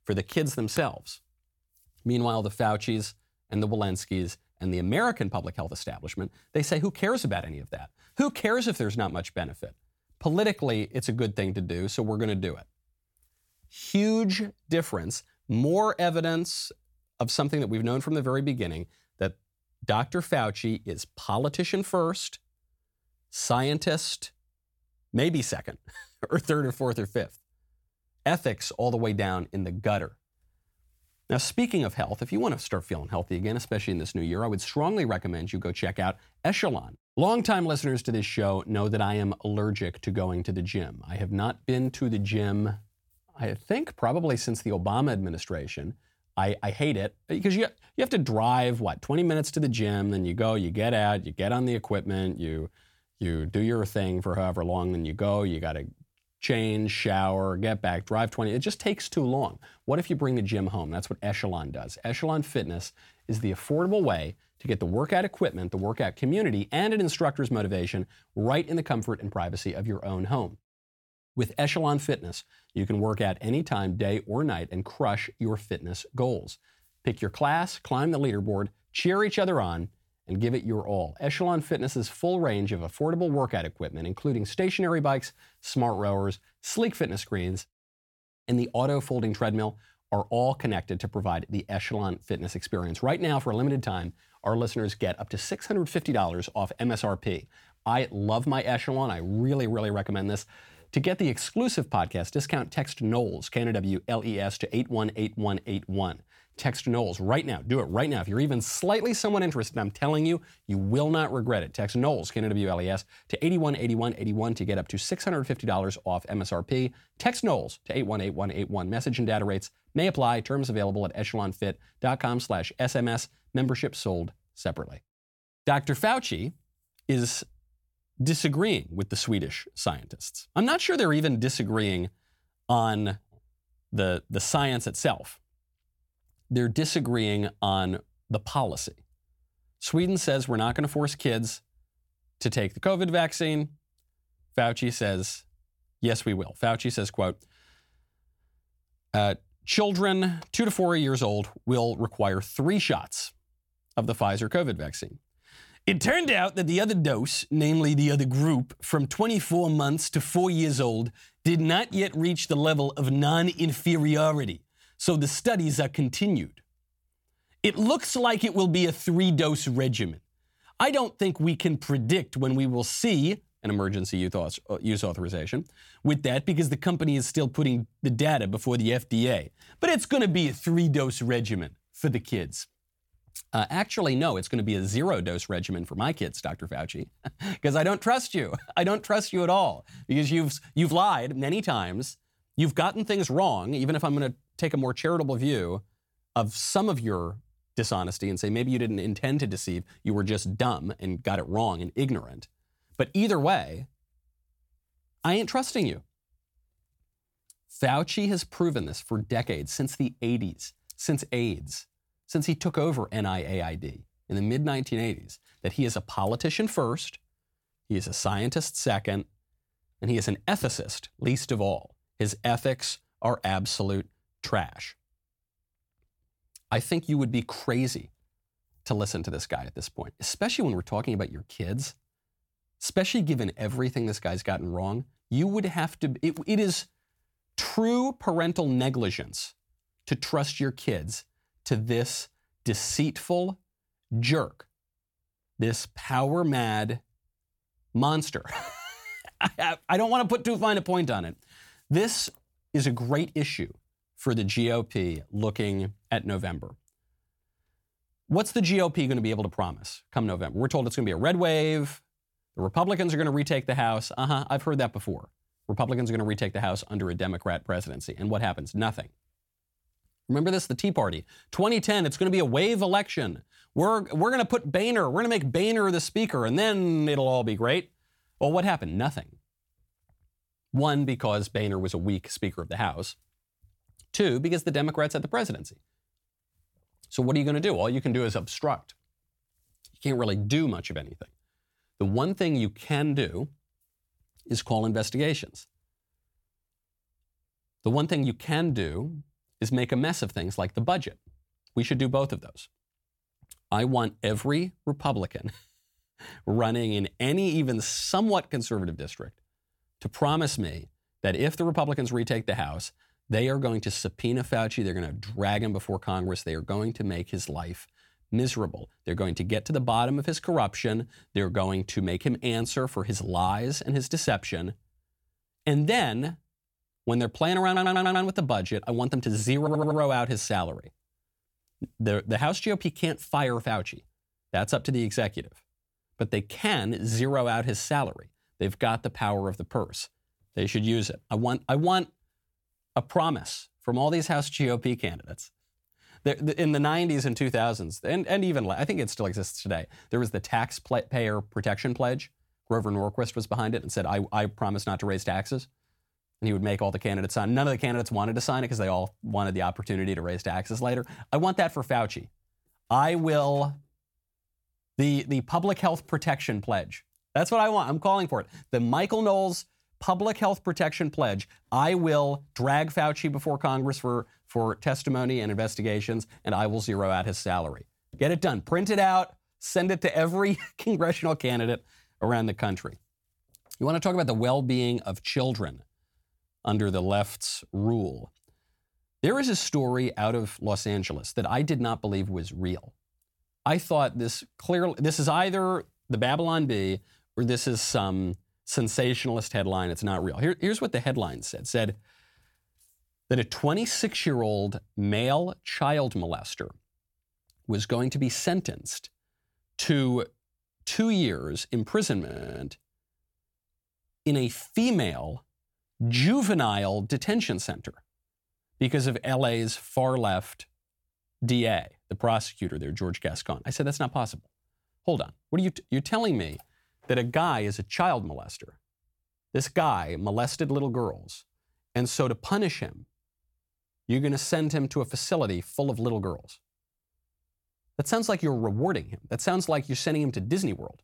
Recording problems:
audio stuttering; at 5:28, at 5:30 and at 6:52

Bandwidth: 17.5 kHz